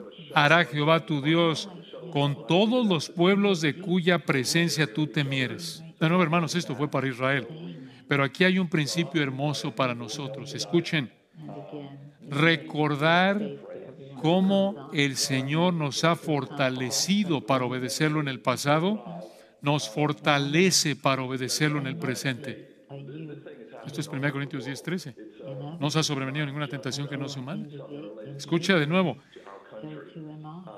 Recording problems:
background chatter; noticeable; throughout; 2 voices, 15 dB below the speech

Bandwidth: 14.5 kHz